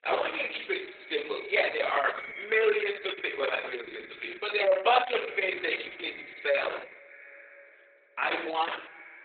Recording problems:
garbled, watery; badly; nothing above 4 kHz
thin; very; fading below 400 Hz
echo of what is said; noticeable; throughout; 310 ms later, 15 dB below the speech
room echo; slight; dies away in 0.5 s
off-mic speech; somewhat distant

